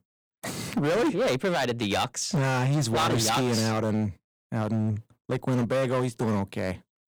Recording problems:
distortion; heavy; 18% of the sound clipped

